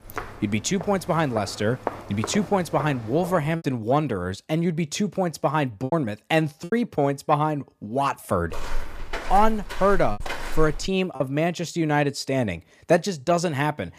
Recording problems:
footsteps; noticeable; until 3.5 s and from 8.5 to 11 s; peak 7 dB below the speech
choppy; very; at 3.5 s, at 6 s and from 10 to 11 s; 5% of the speech affected

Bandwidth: 15 kHz